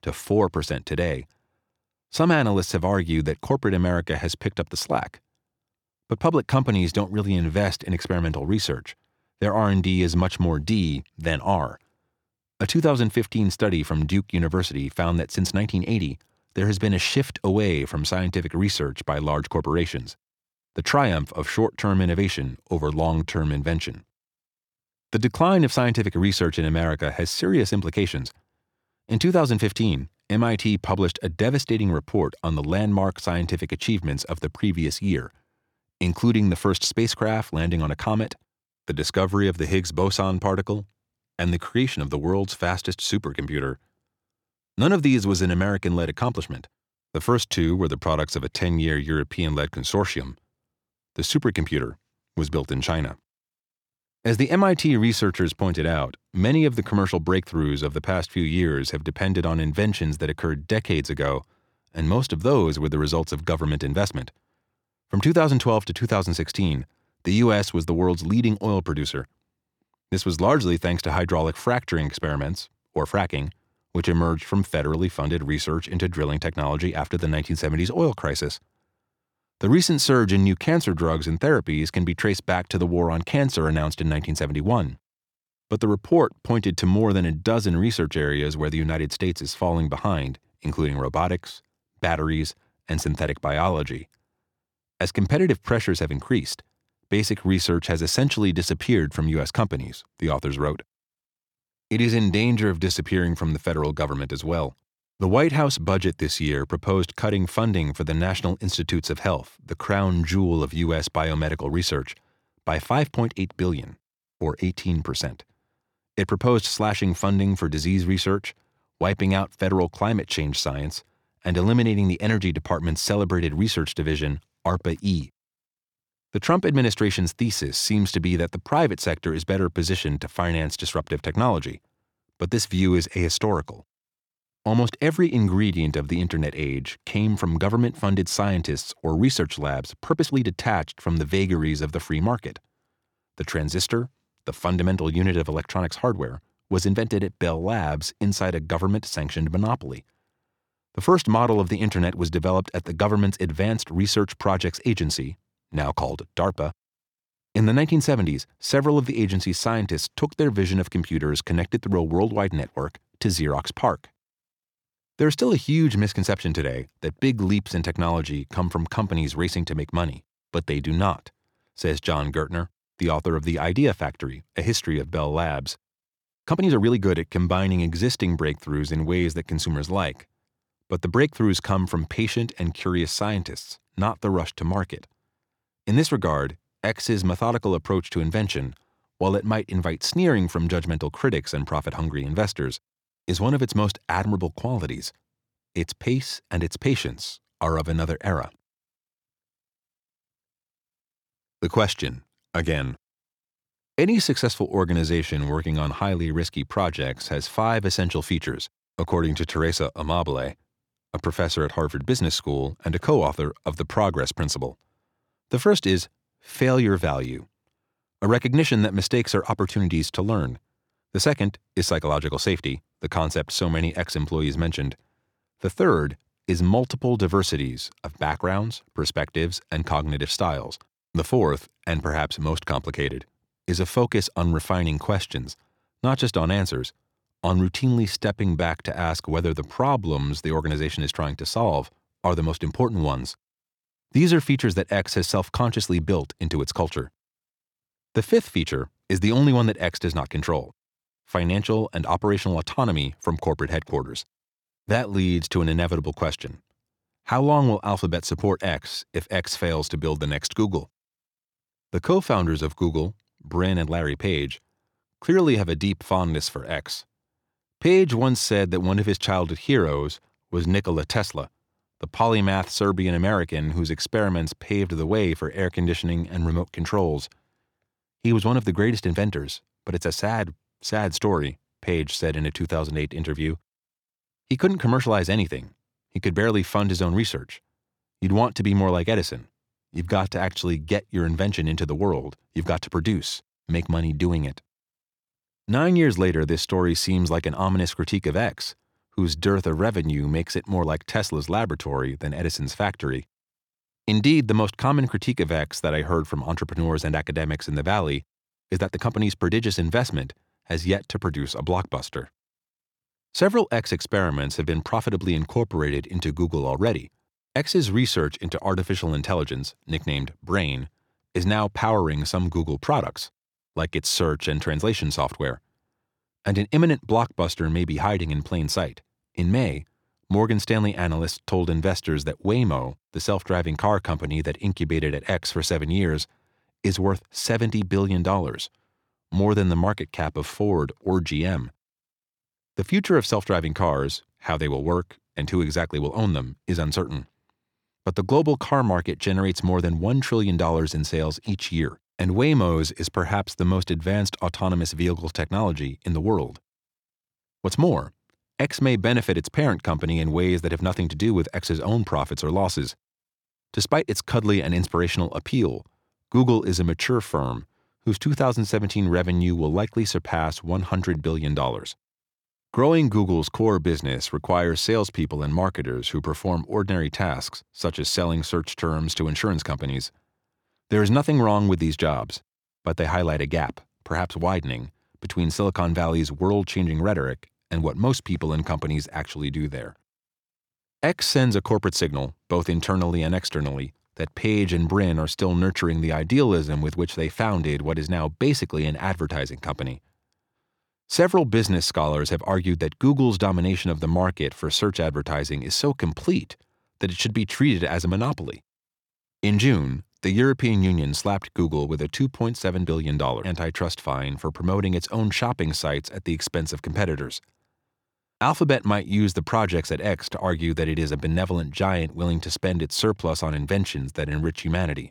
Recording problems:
uneven, jittery; strongly; from 23 s to 7:04

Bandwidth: 18.5 kHz